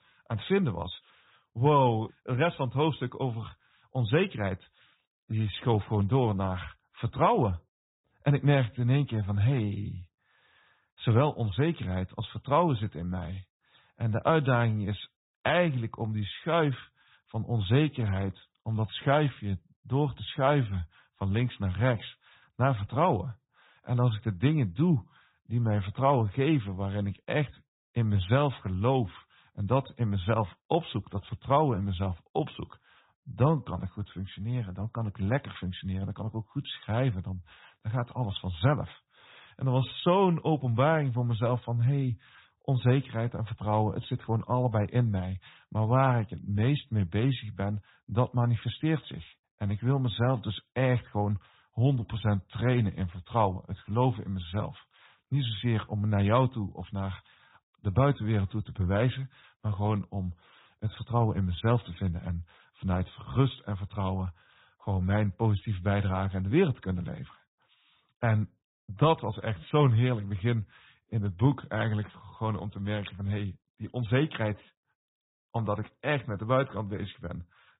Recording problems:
high frequencies cut off; severe; nothing above 4 kHz
garbled, watery; slightly

